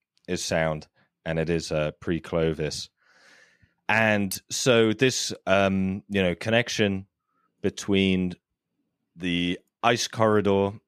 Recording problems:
none

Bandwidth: 14.5 kHz